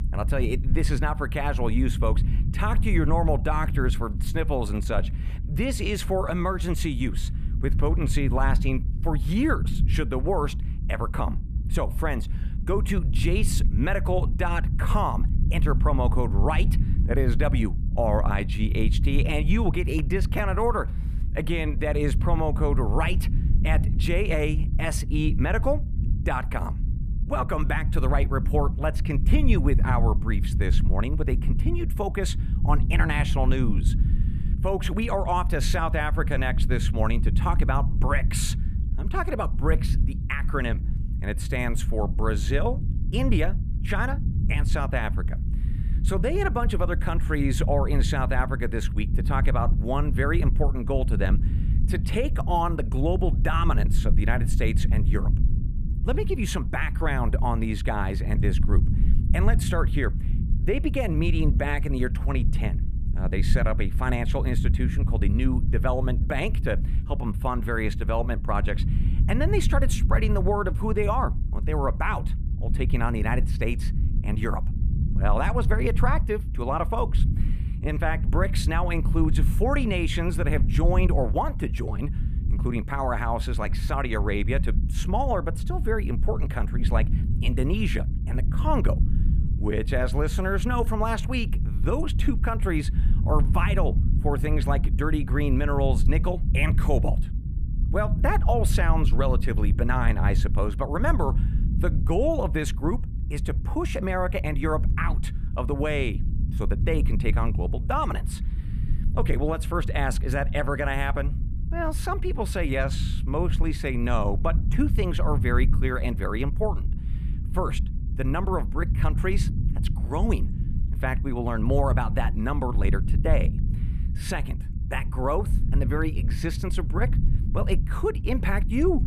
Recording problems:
low rumble; noticeable; throughout; 15 dB below the speech

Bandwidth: 14.5 kHz